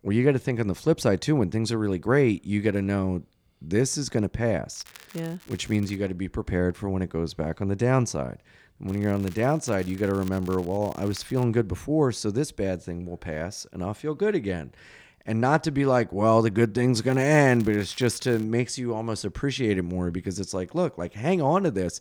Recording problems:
crackling; faint; from 4.5 to 6 s, from 9 to 11 s and from 17 to 18 s; 25 dB below the speech

